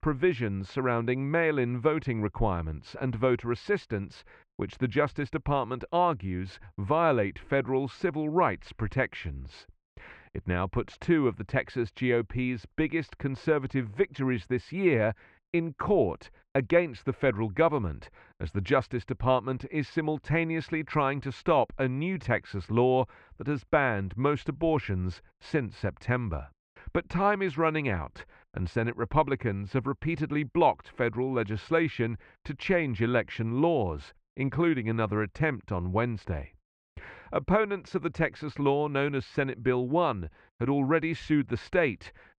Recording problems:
muffled; very; fading above 2.5 kHz

